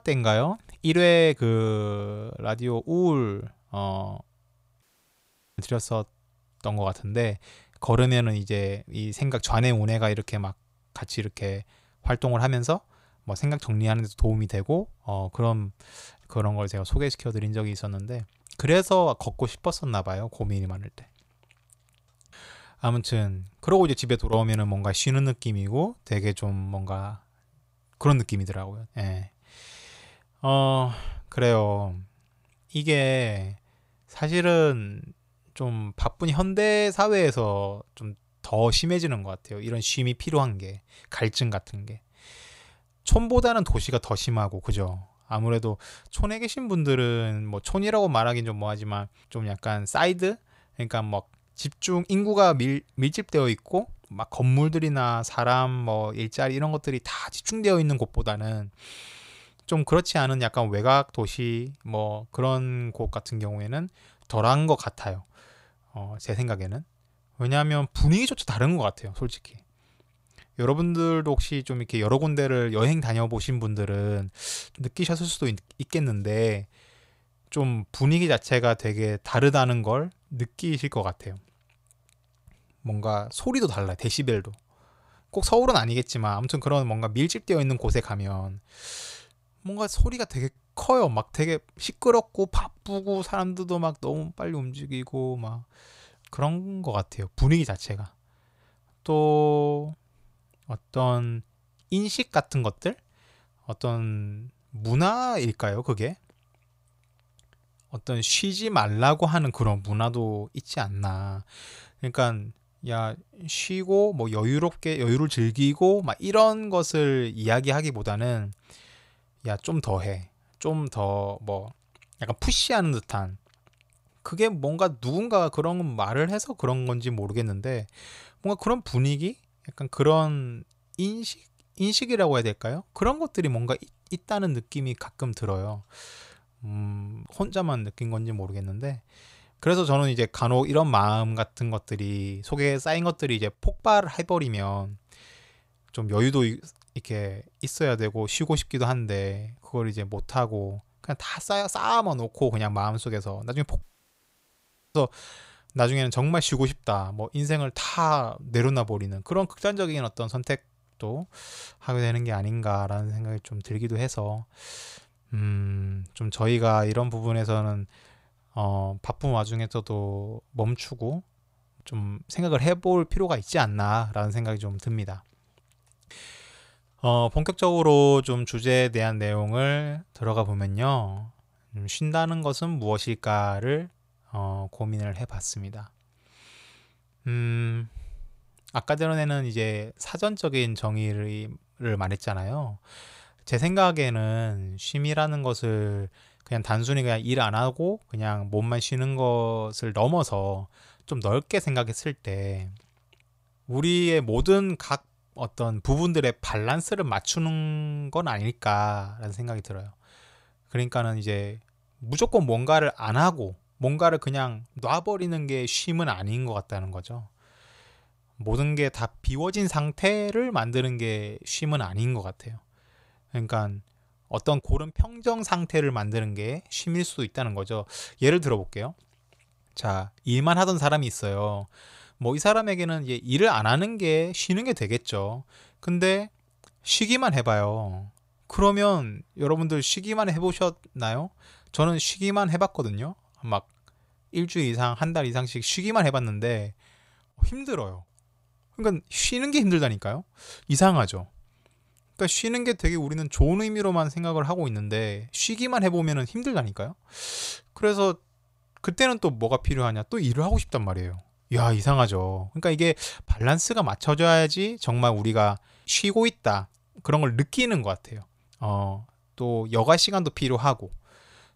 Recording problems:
audio cutting out; at 5 s for 1 s and at 2:34 for 1 s

